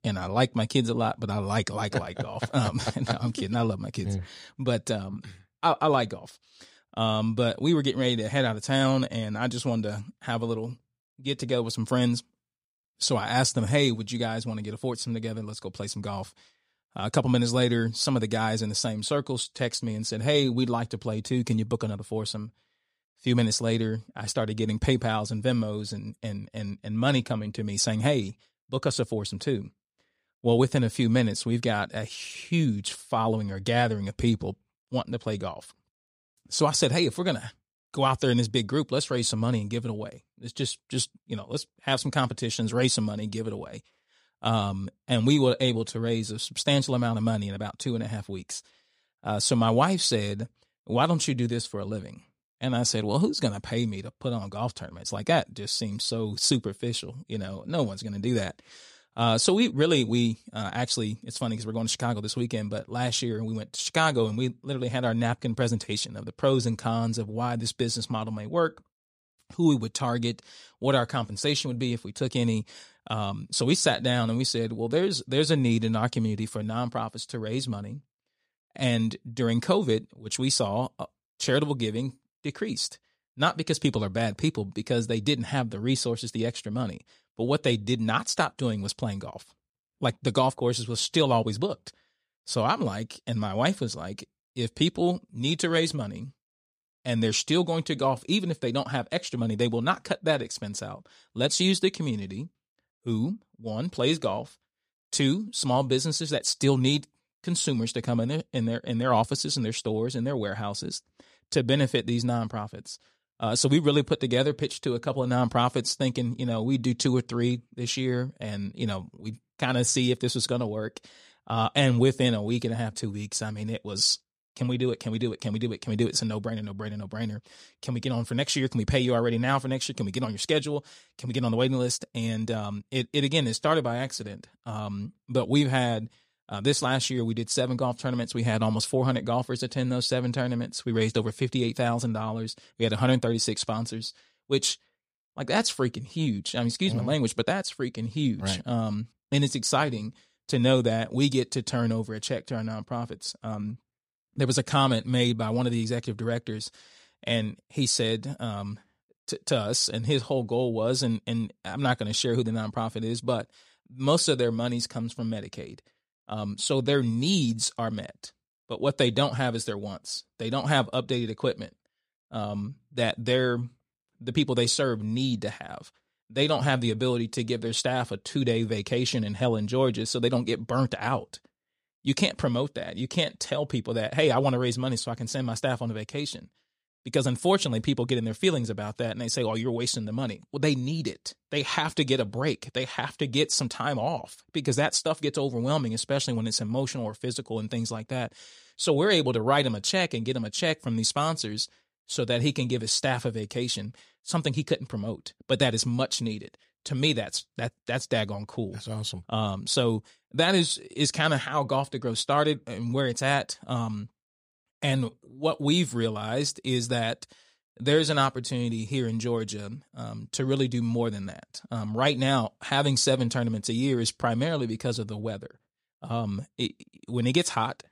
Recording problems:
none

